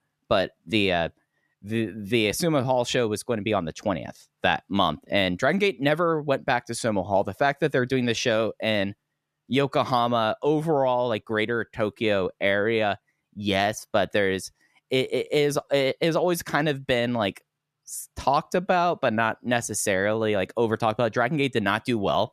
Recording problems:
none

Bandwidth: 14 kHz